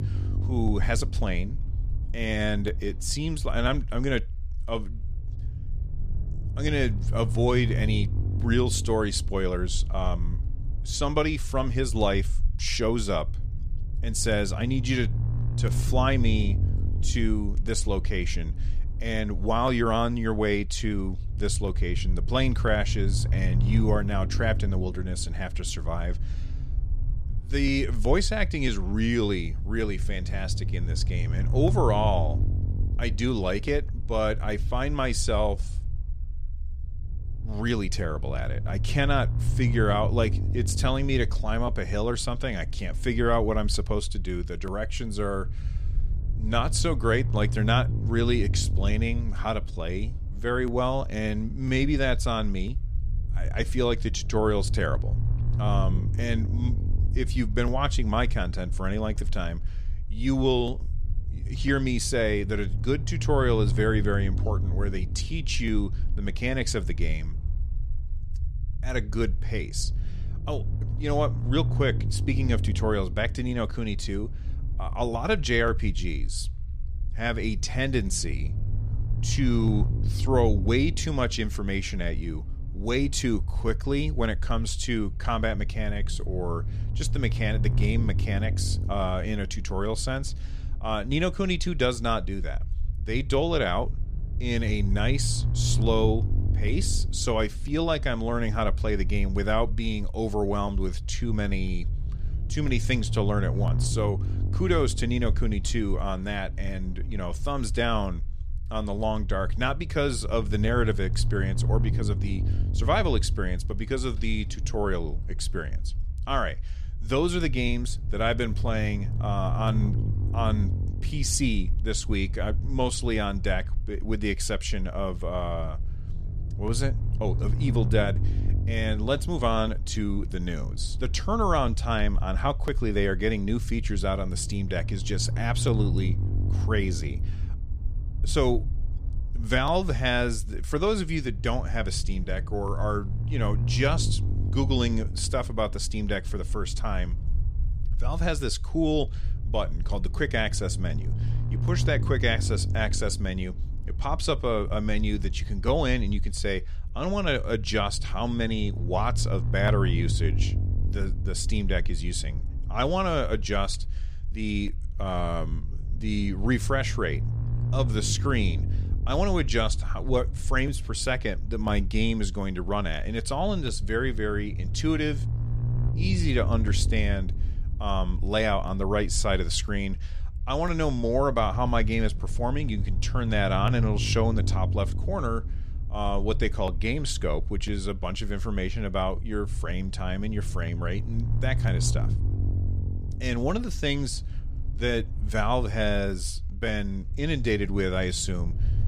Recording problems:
low rumble; noticeable; throughout; 15 dB below the speech

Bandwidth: 14.5 kHz